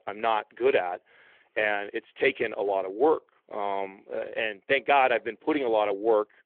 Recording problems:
phone-call audio

